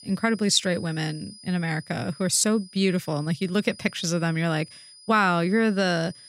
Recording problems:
high-pitched whine; faint; throughout; 5 kHz, 20 dB below the speech

